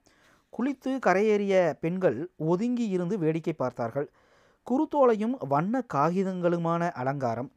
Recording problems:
none

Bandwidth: 15.5 kHz